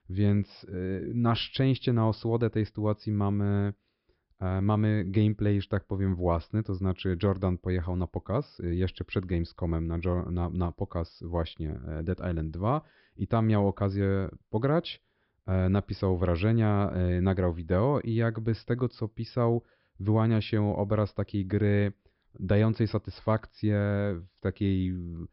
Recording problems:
high frequencies cut off; noticeable; nothing above 5.5 kHz

